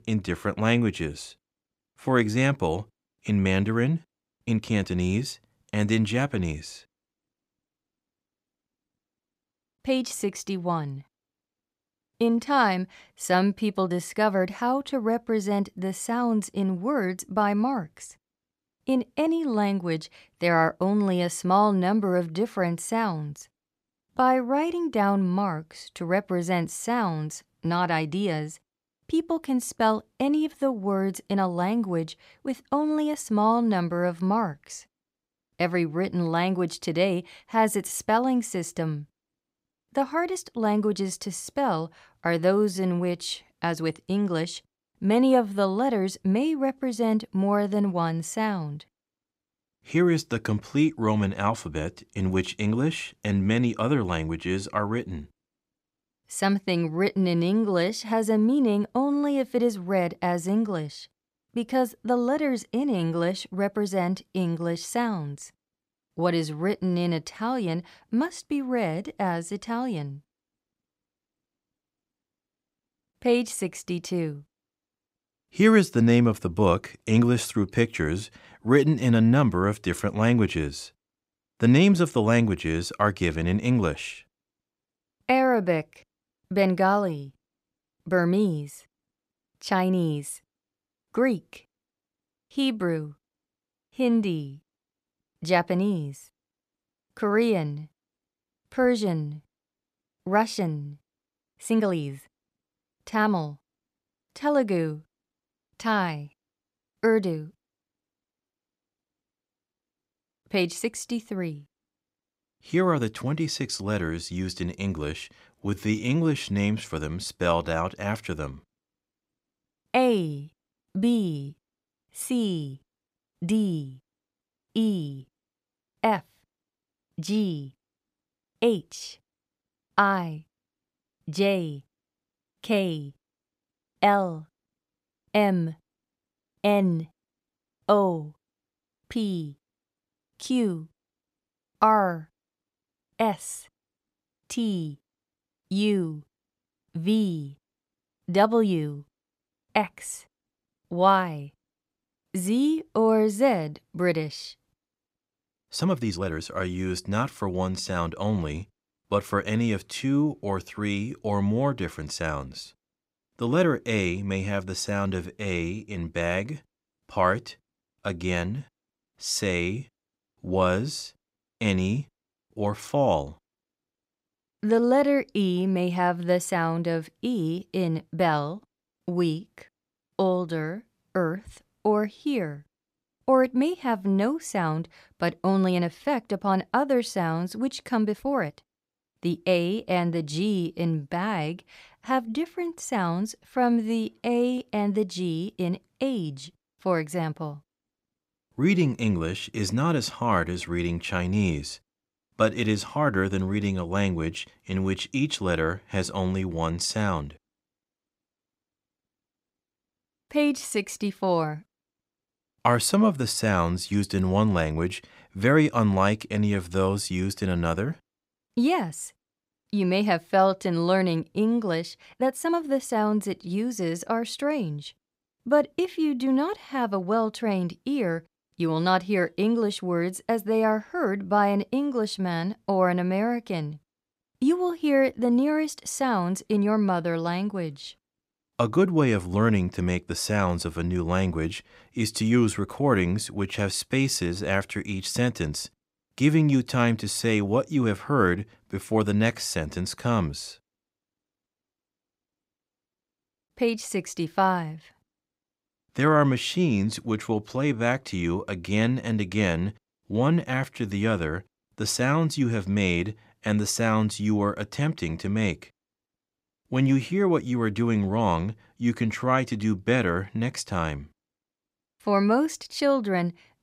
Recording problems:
uneven, jittery; strongly; from 4.5 s to 3:43

